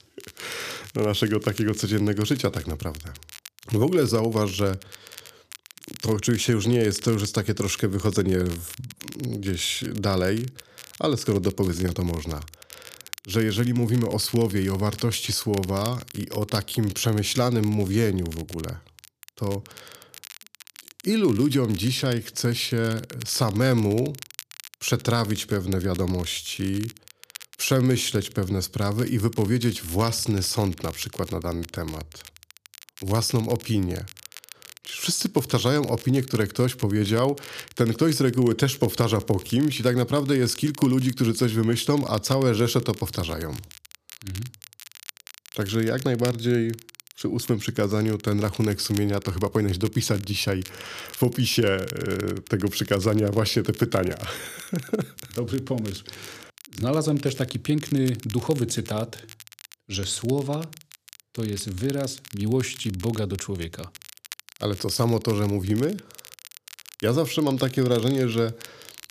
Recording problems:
crackle, like an old record; noticeable; 20 dB below the speech

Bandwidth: 14.5 kHz